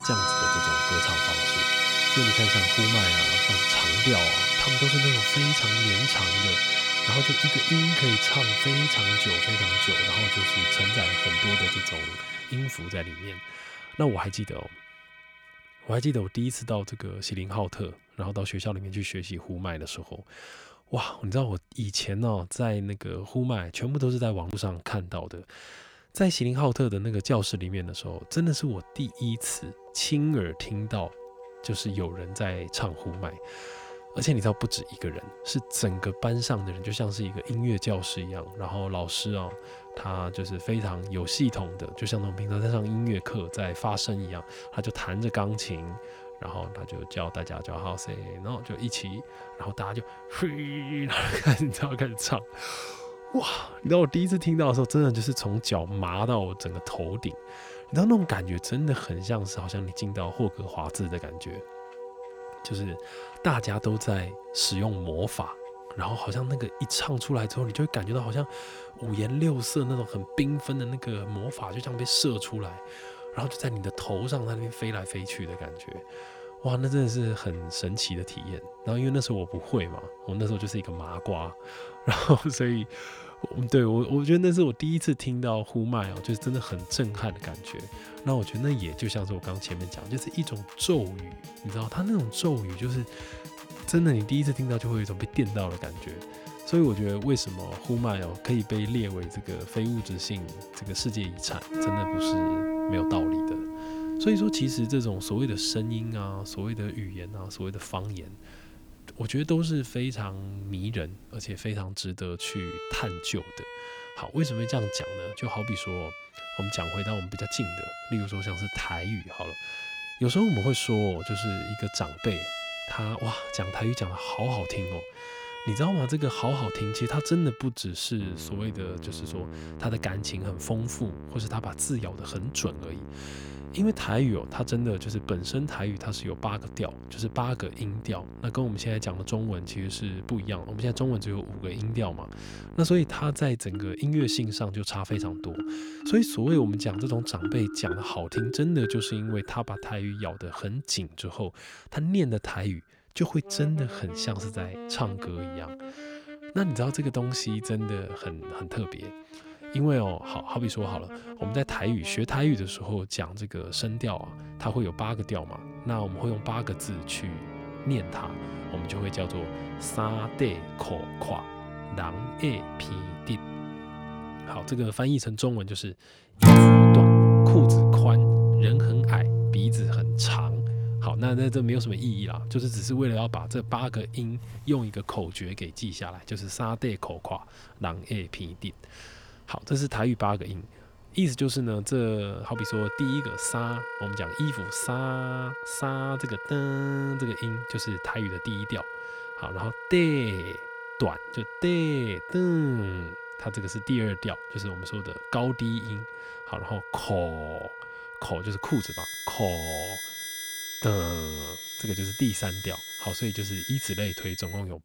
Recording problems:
background music; very loud; throughout; 3 dB above the speech

